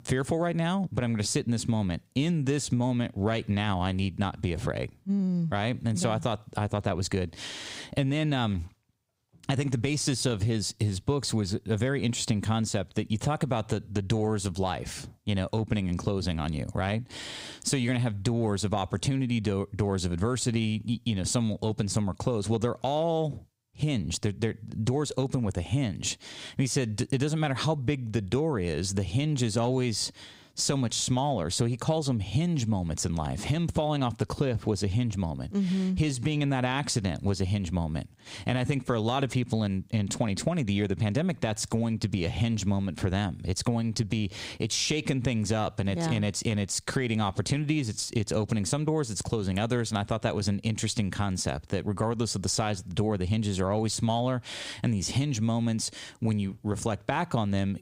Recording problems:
squashed, flat; somewhat

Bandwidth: 15.5 kHz